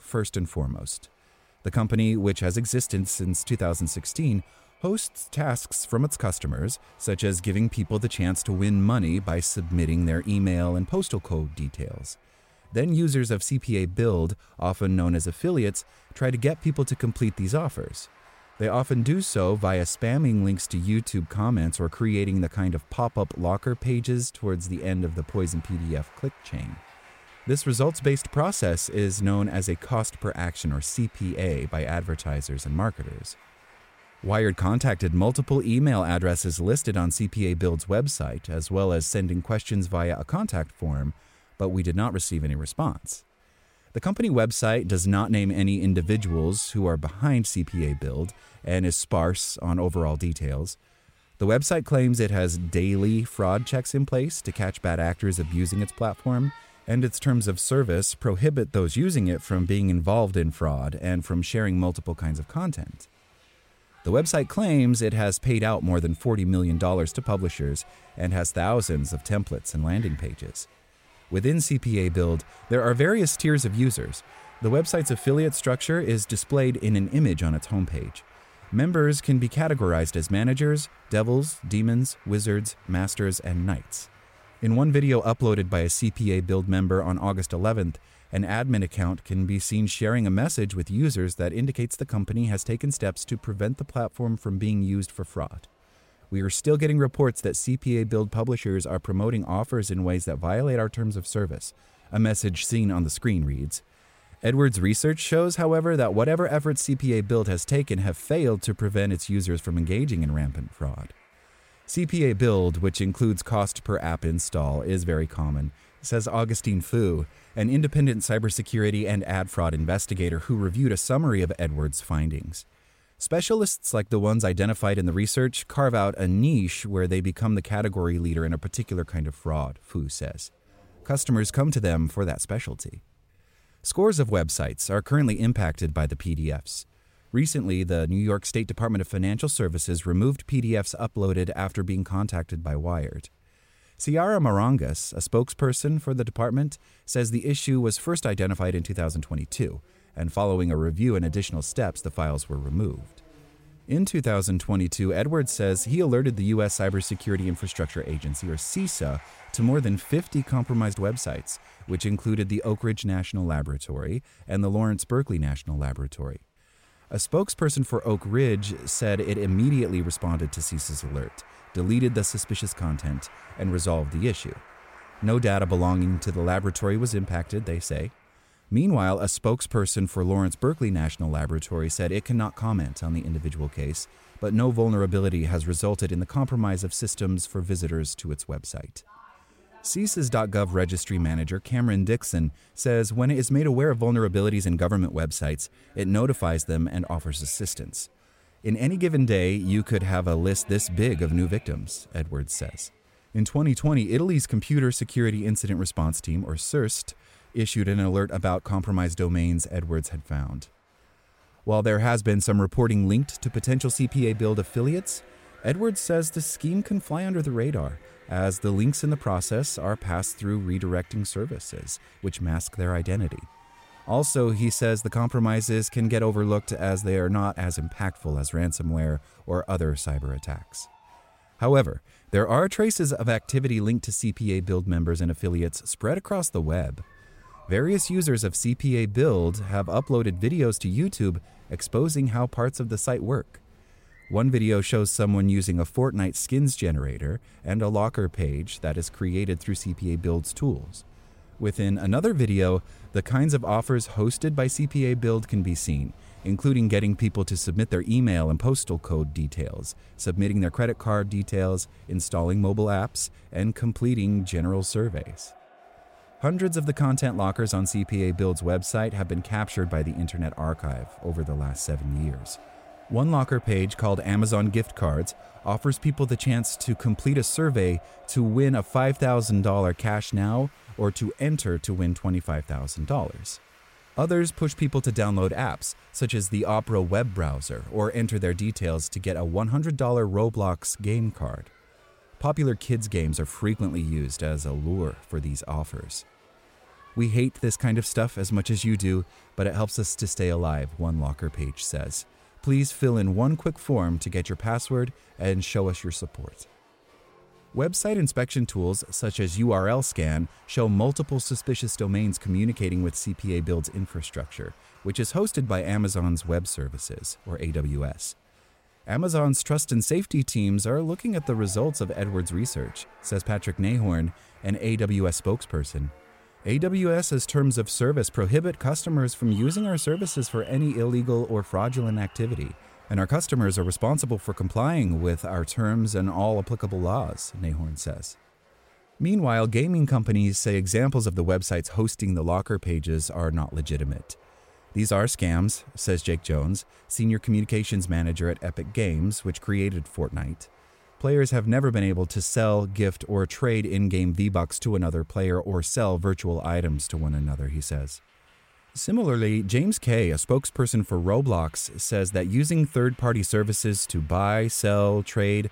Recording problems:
crowd noise; faint; throughout; 30 dB below the speech

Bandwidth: 16 kHz